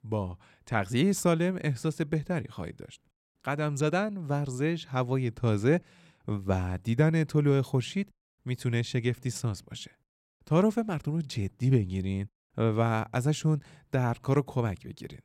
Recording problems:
none

